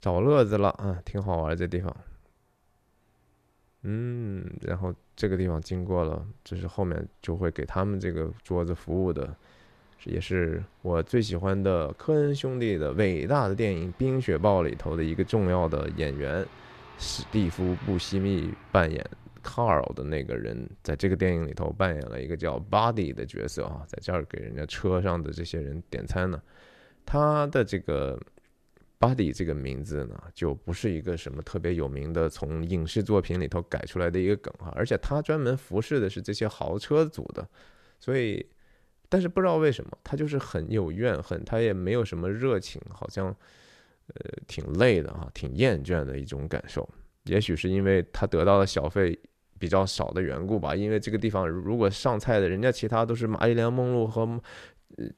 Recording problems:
traffic noise; faint; throughout; 25 dB below the speech

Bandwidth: 14 kHz